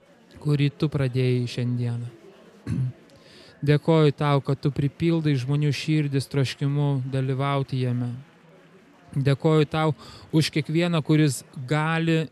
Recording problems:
chatter from many people; faint; throughout; 30 dB below the speech

